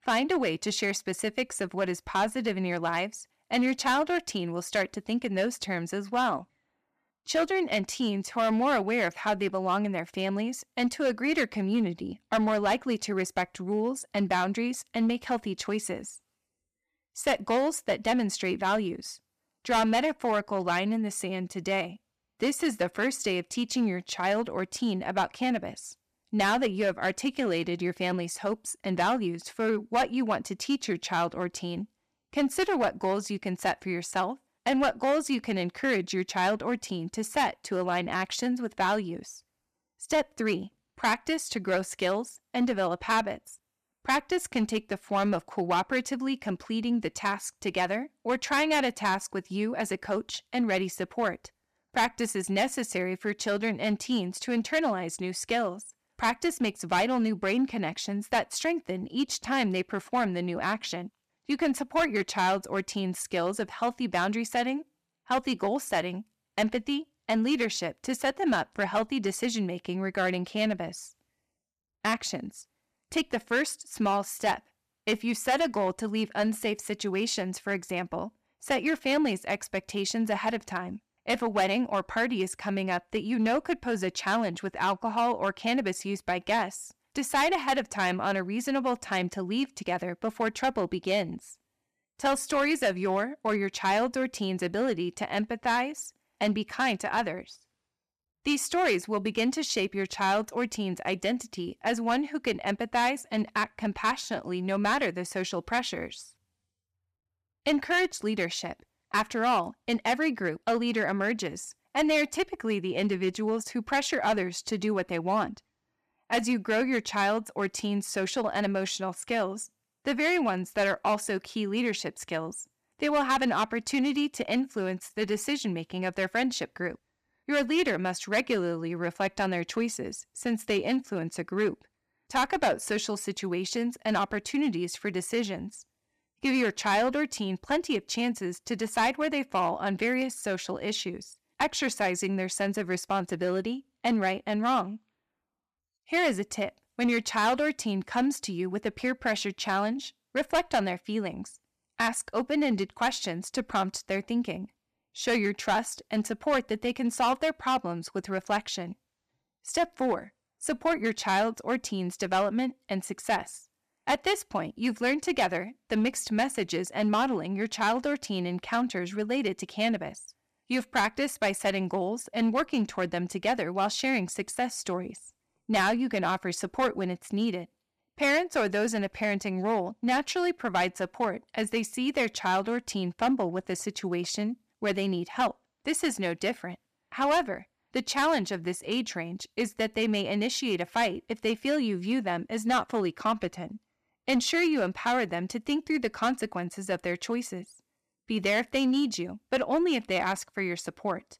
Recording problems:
distortion; slight; 4% of the sound clipped

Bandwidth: 14.5 kHz